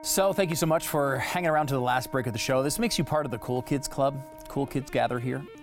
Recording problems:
background music; noticeable; throughout; 20 dB below the speech

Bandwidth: 16.5 kHz